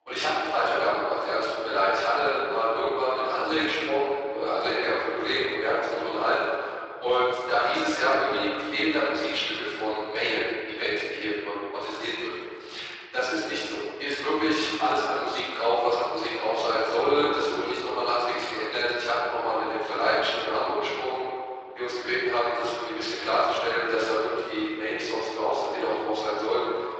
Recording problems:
room echo; strong; dies away in 2.1 s
off-mic speech; far
thin; very; fading below 300 Hz
garbled, watery; slightly; nothing above 7.5 kHz

